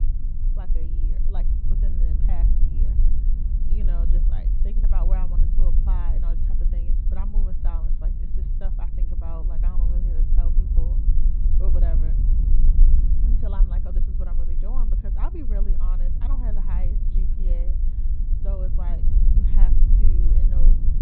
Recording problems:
high frequencies cut off; severe; nothing above 4.5 kHz
muffled; very slightly; fading above 3.5 kHz
low rumble; loud; throughout; 1 dB below the speech

